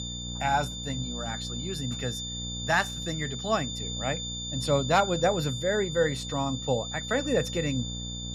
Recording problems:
high-pitched whine; loud; throughout; 3.5 kHz, 6 dB below the speech
electrical hum; faint; throughout; 60 Hz, 20 dB below the speech

